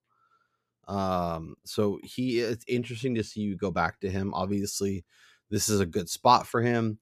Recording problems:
none

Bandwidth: 14.5 kHz